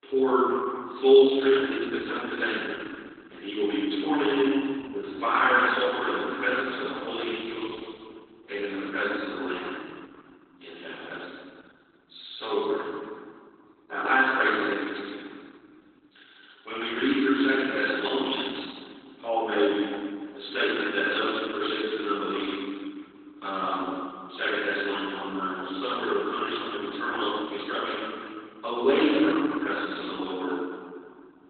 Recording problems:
room echo; strong; dies away in 2 s
off-mic speech; far
garbled, watery; badly; nothing above 4 kHz
thin; very slightly; fading below 300 Hz

